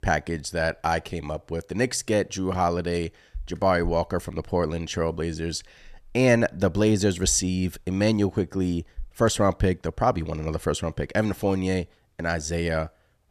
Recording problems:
none

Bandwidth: 14 kHz